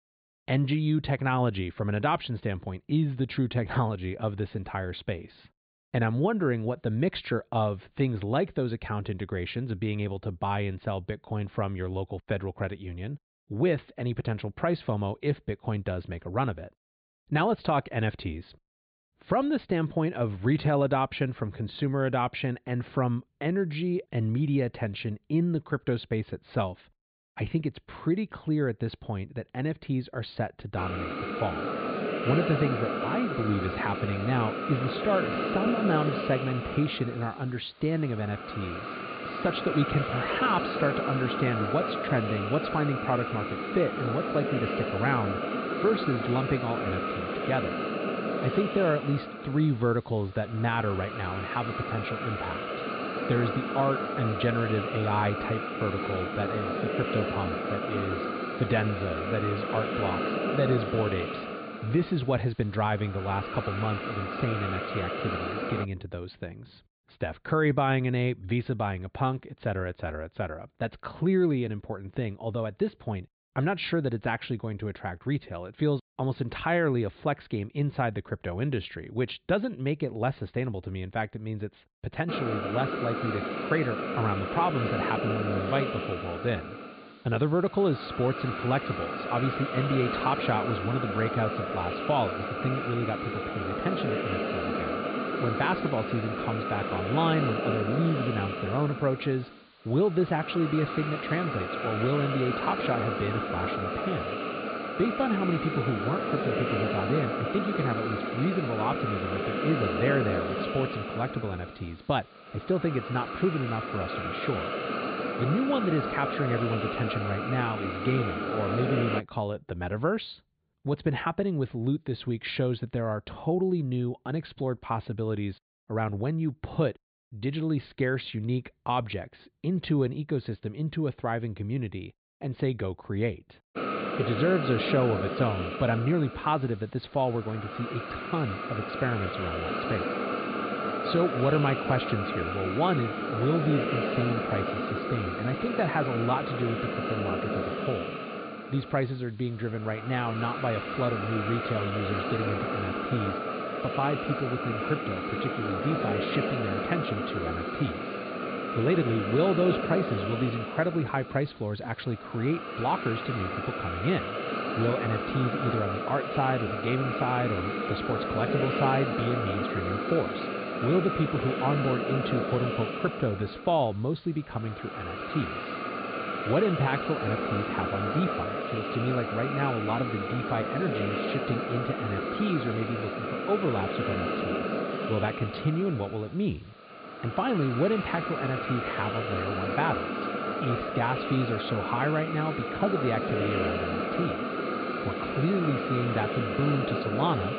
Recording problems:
high frequencies cut off; severe; nothing above 4.5 kHz
hiss; loud; from 31 s to 1:06, from 1:22 to 1:59 and from 2:14 on; 2 dB below the speech

